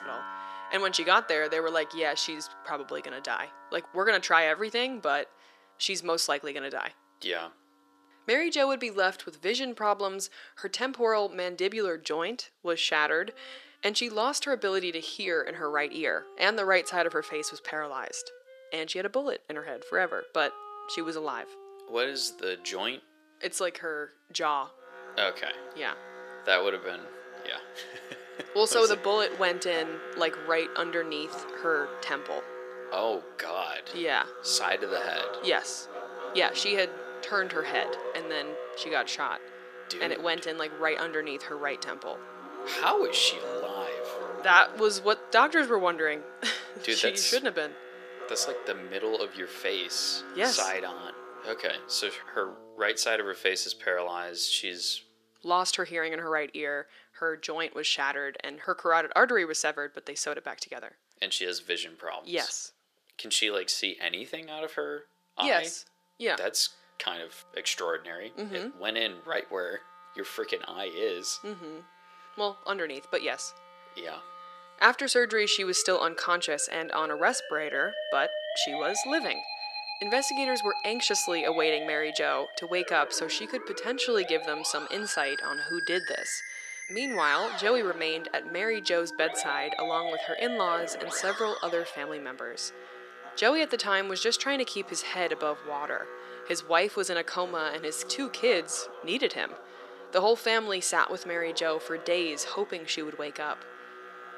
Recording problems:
thin; very; fading below 400 Hz
background music; noticeable; throughout; 10 dB below the speech

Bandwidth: 14.5 kHz